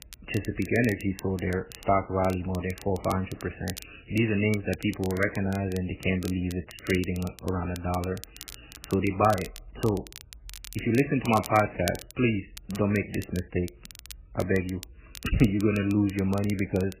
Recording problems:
garbled, watery; badly; nothing above 3 kHz
crackle, like an old record; noticeable; 15 dB below the speech

